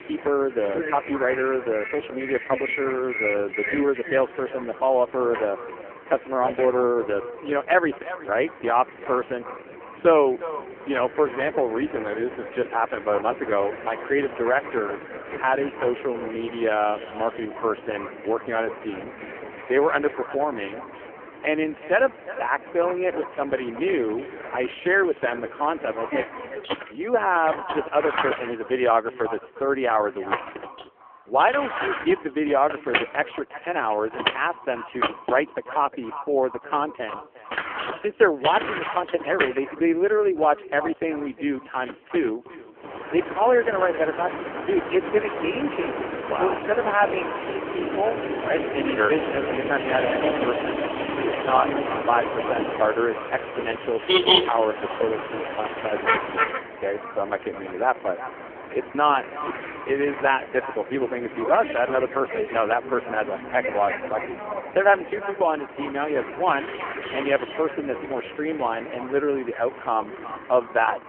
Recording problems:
phone-call audio; poor line
echo of what is said; noticeable; throughout; 360 ms later, 15 dB below the speech
traffic noise; loud; throughout; 6 dB below the speech

